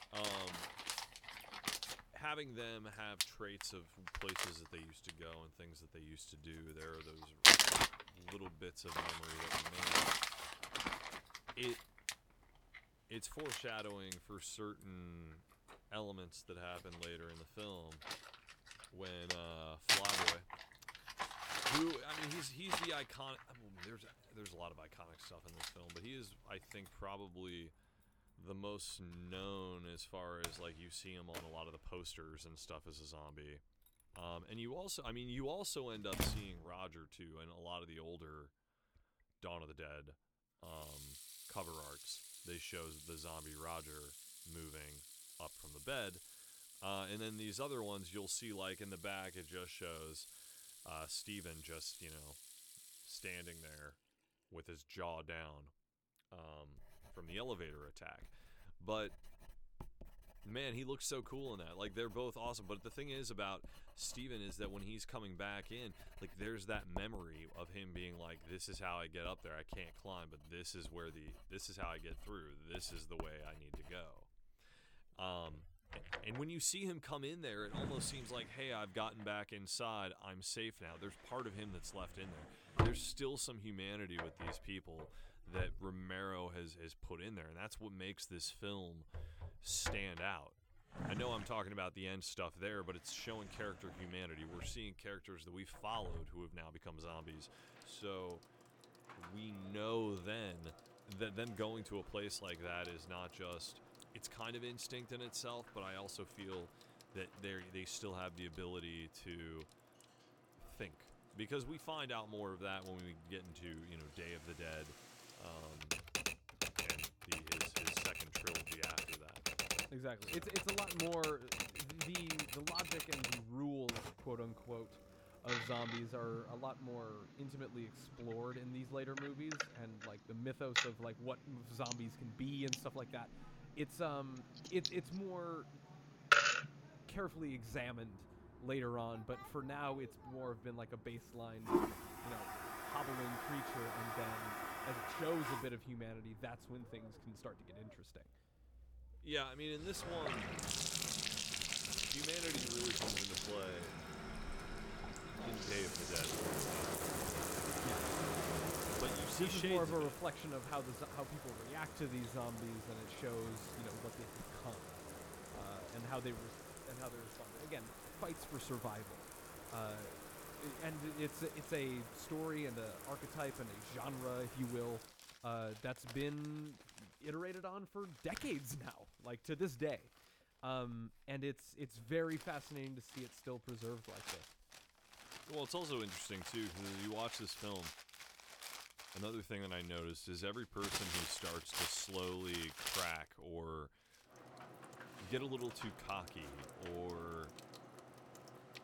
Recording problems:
household noises; very loud; throughout; 5 dB above the speech

